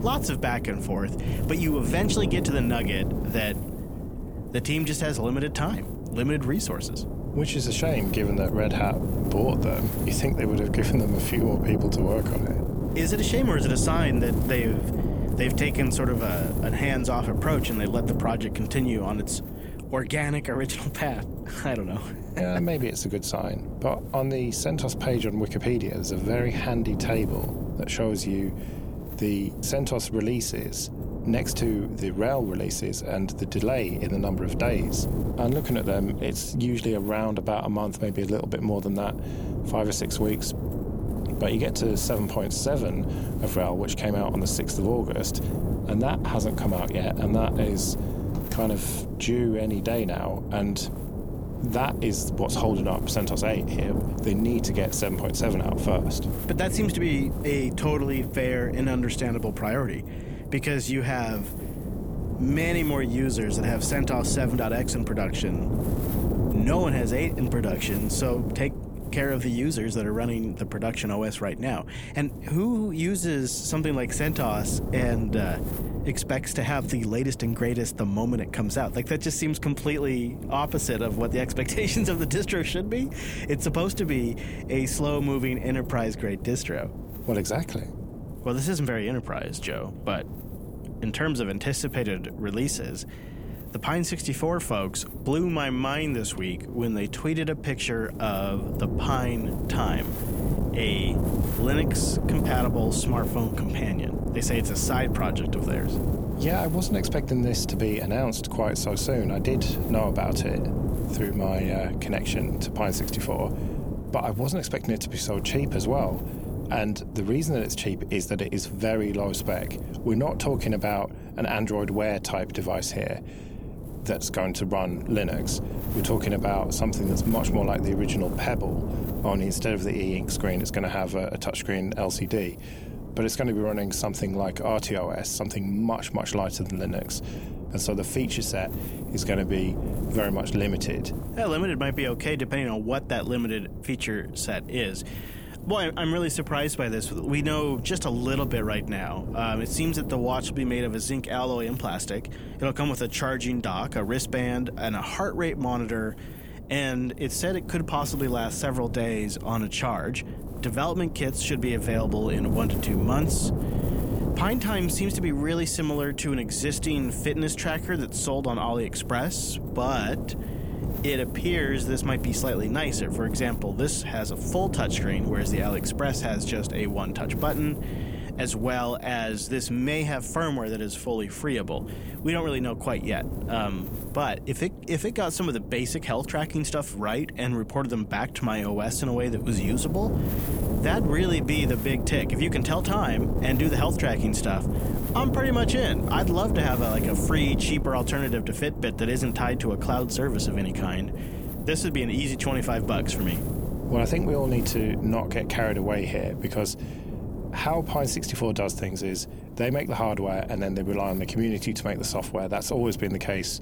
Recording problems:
wind noise on the microphone; heavy; 9 dB below the speech
door banging; noticeable; at 48 s; peak 10 dB below the speech

